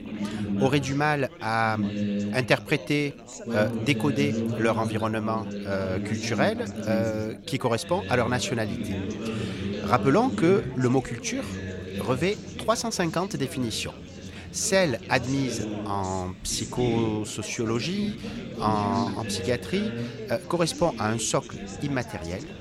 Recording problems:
background chatter; loud; throughout; 4 voices, 6 dB below the speech

